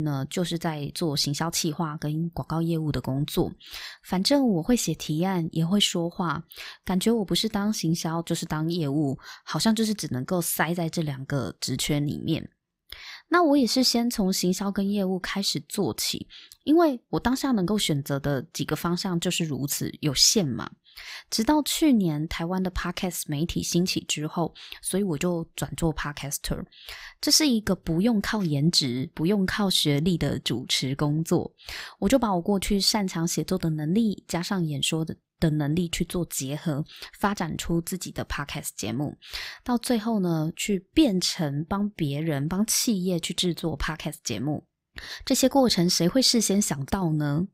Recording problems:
abrupt cut into speech; at the start

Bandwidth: 15.5 kHz